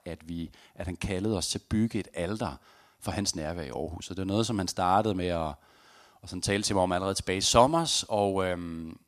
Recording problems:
none

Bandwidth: 14.5 kHz